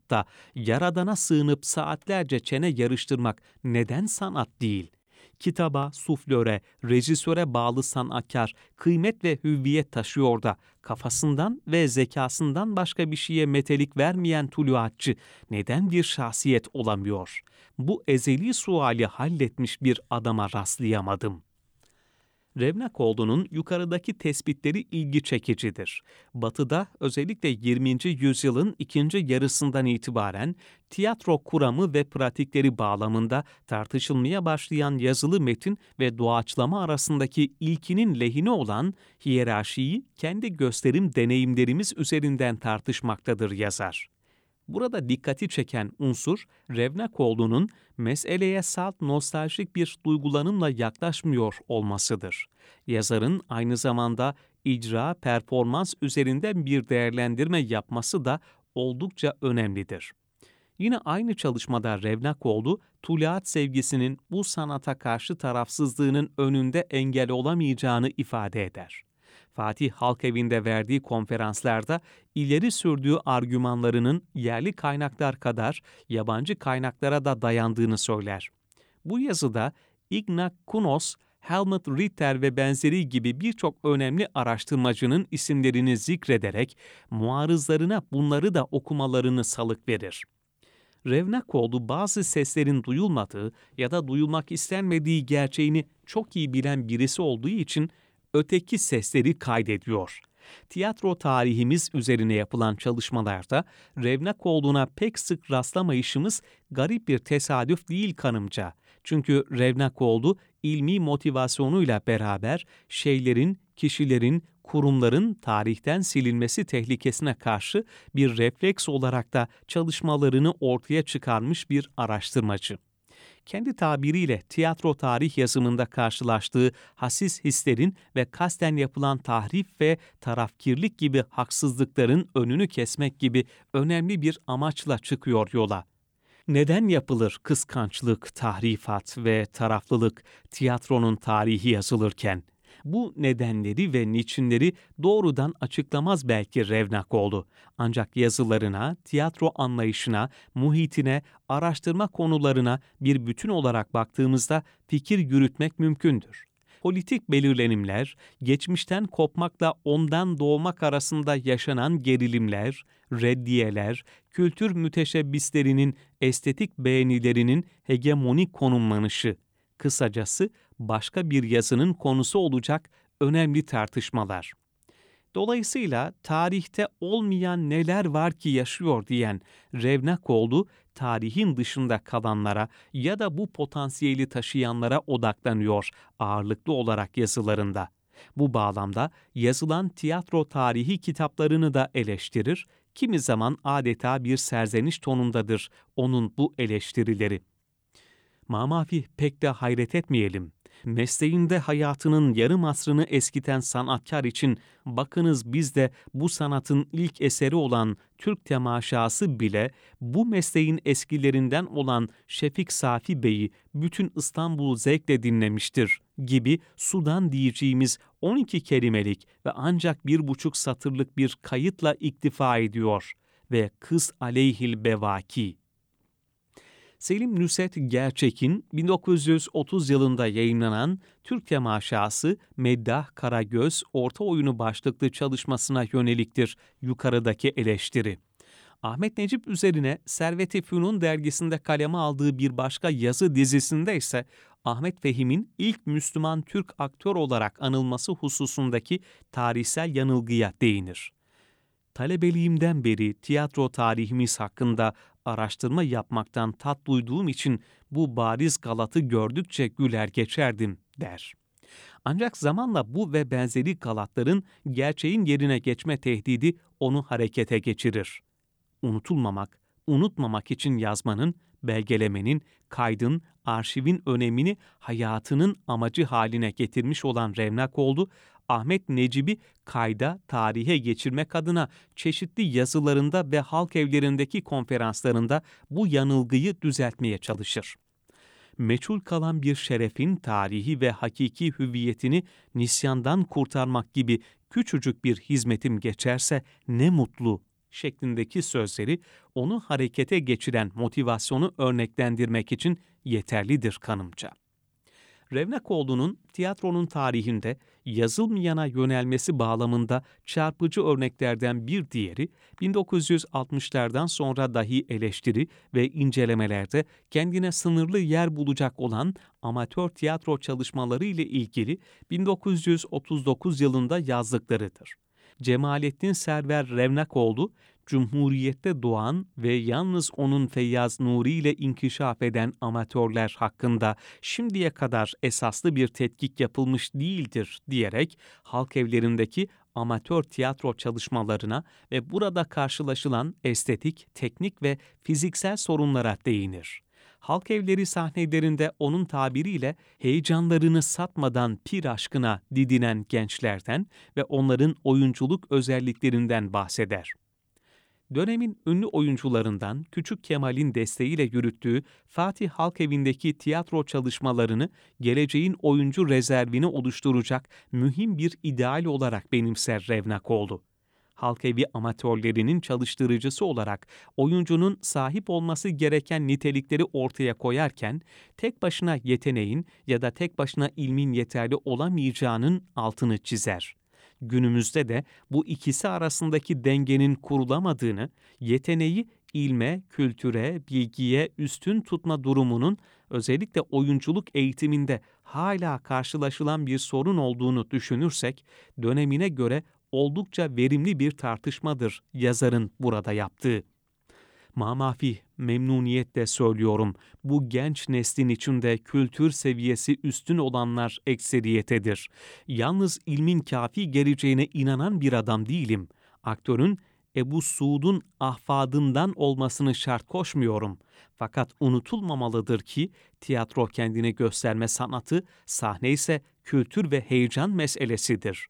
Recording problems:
none

